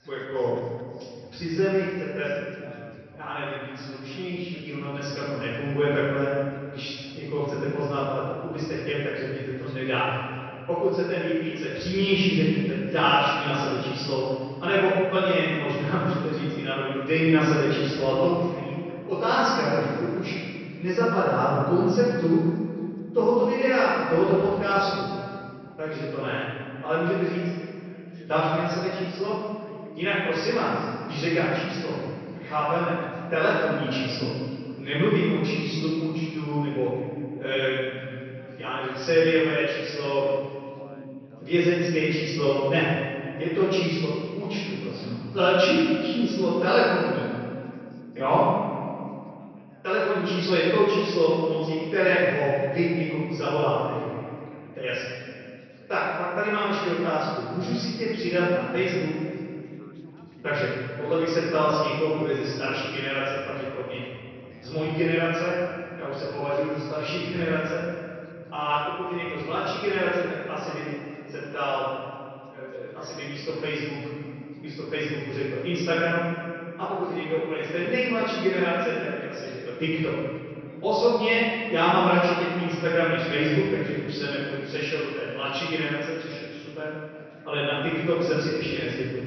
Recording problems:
room echo; strong; dies away in 2.2 s
off-mic speech; far
high frequencies cut off; noticeable; nothing above 5.5 kHz
background chatter; faint; throughout; 3 voices, 25 dB below the speech

